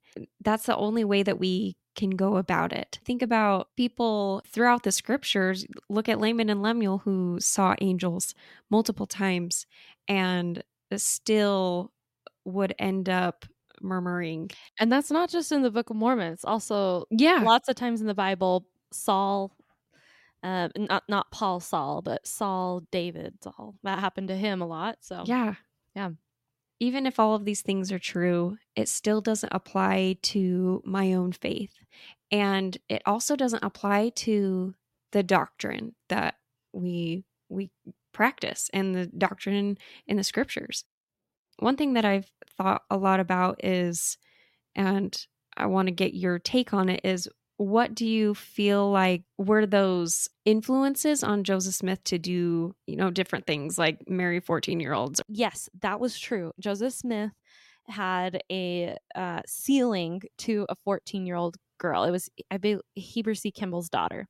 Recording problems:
none

